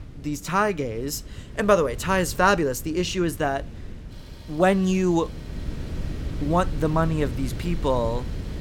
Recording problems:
wind noise on the microphone; occasional gusts; 20 dB below the speech
traffic noise; faint; throughout; 30 dB below the speech

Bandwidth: 17 kHz